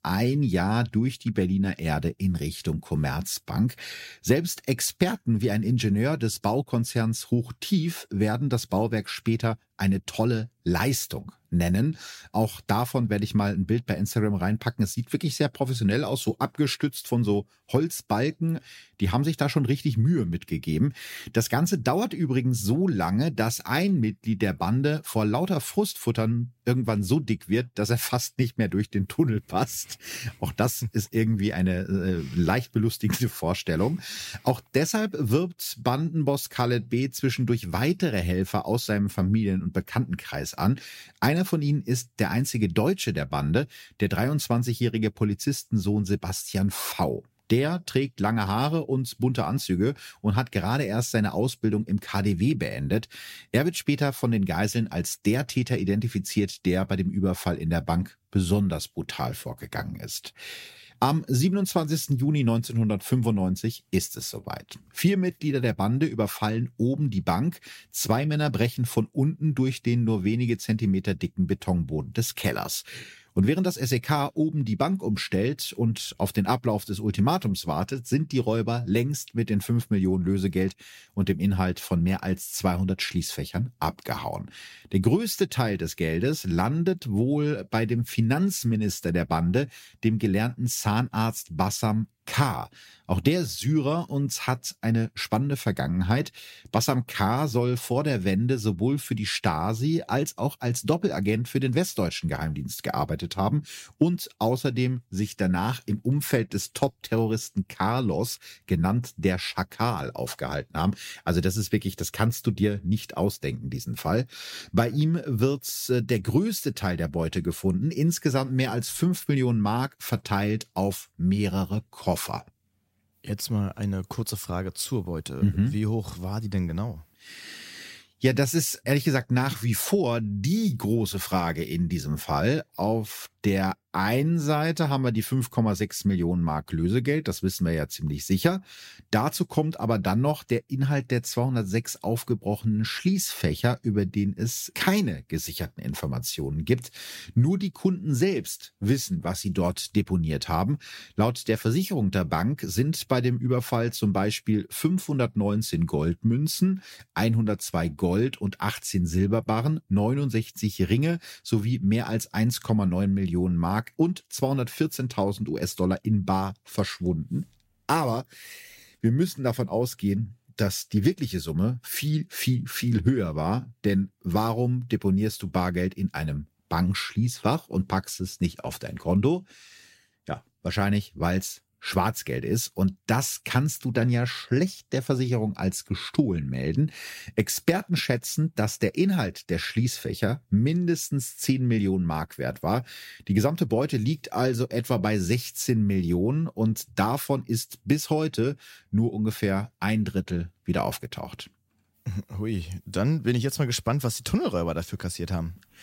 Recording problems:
none

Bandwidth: 16 kHz